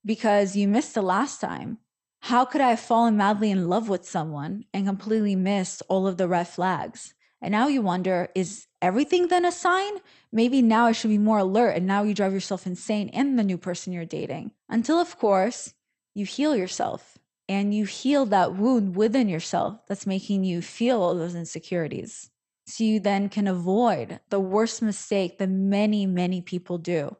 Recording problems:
garbled, watery; slightly; nothing above 8.5 kHz

